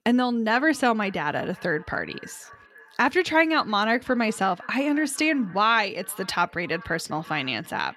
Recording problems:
echo of what is said; faint; throughout; 530 ms later, 25 dB below the speech

